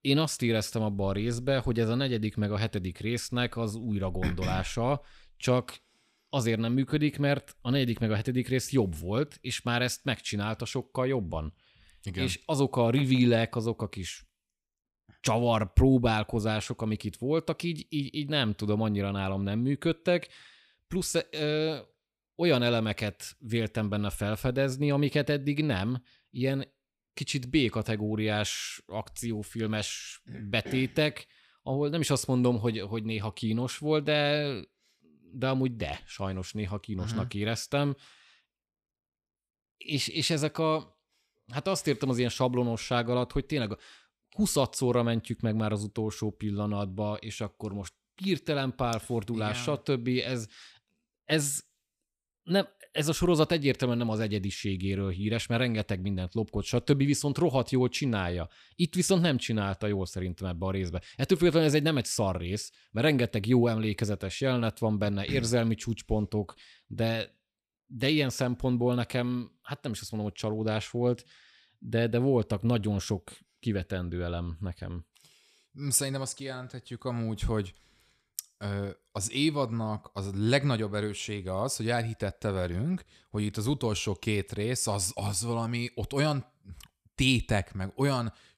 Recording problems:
none

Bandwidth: 15.5 kHz